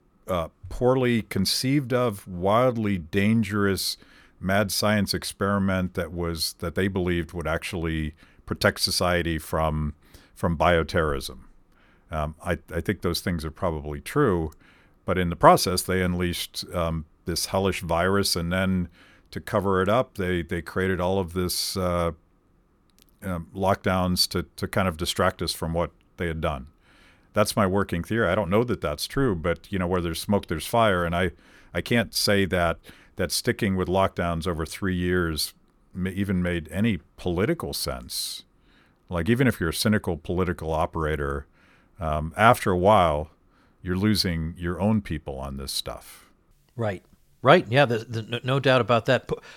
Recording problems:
uneven, jittery; strongly; from 2.5 to 48 s

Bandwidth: 18 kHz